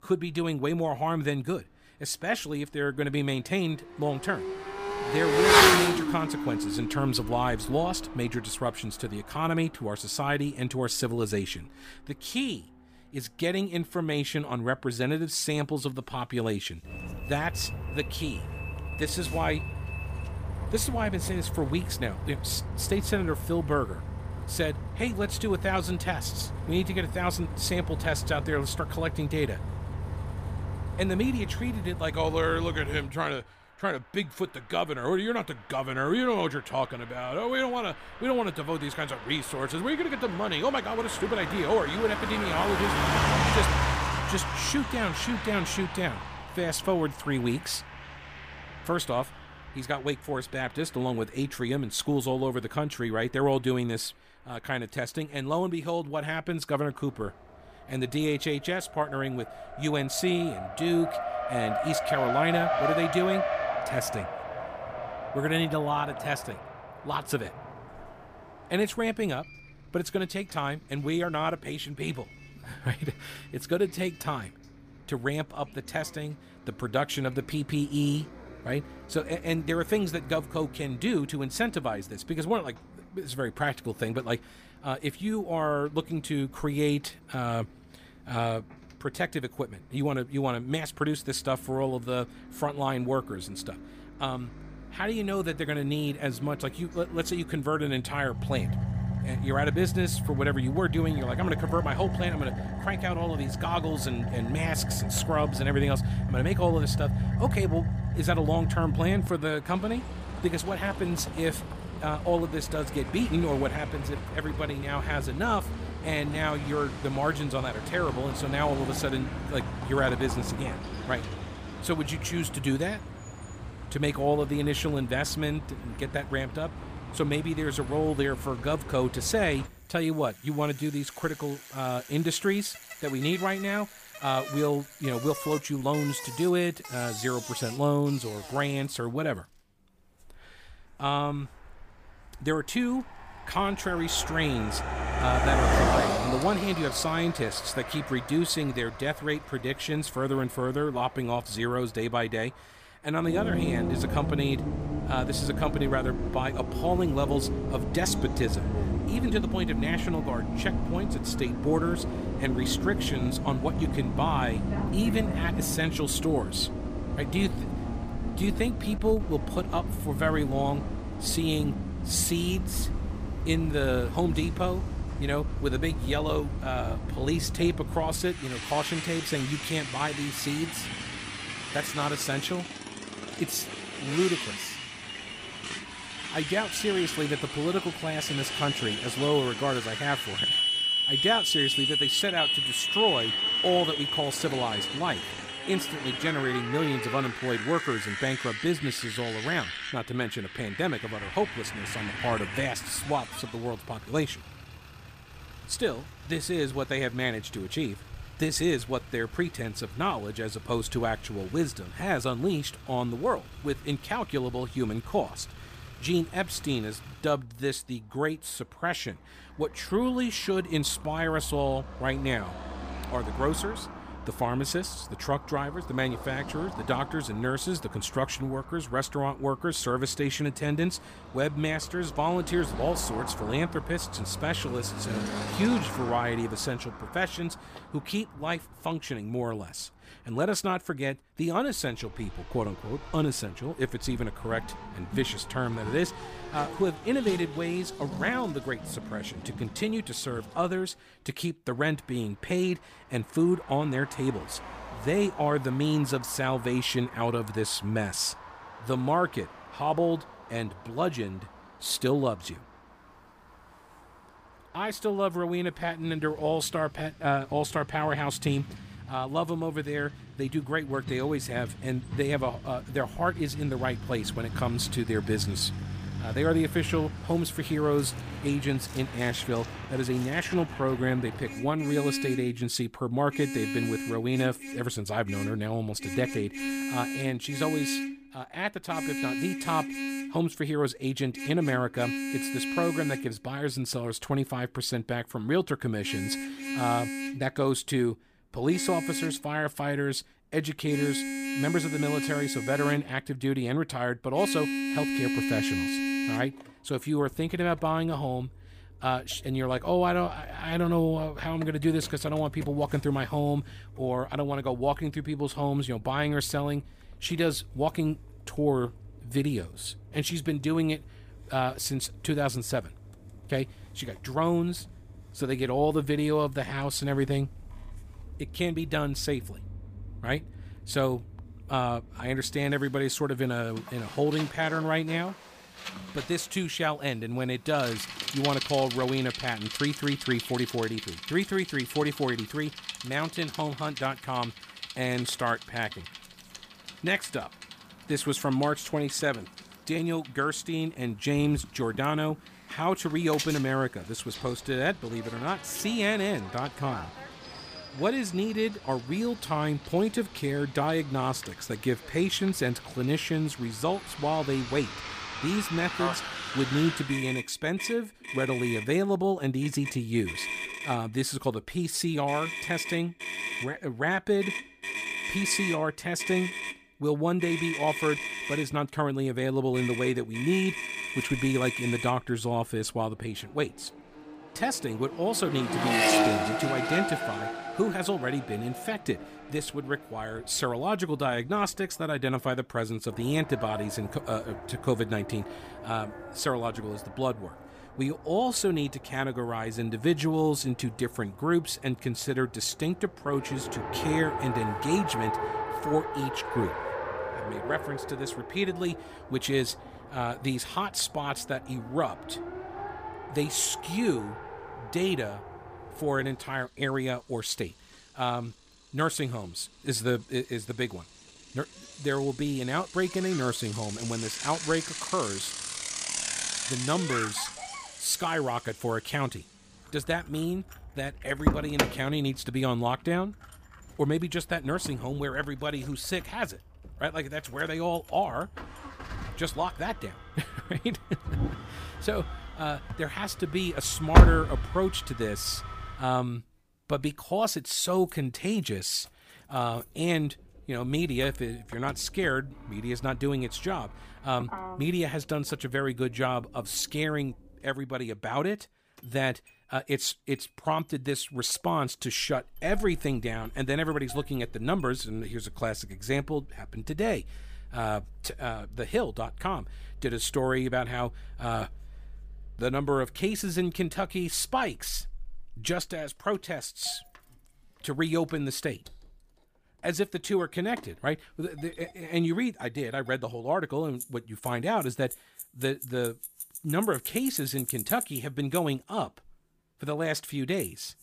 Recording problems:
traffic noise; loud; throughout; 3 dB below the speech

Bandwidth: 15 kHz